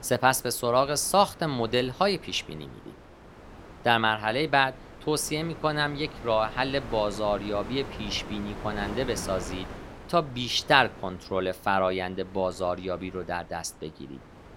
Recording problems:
wind noise on the microphone; occasional gusts; 20 dB below the speech

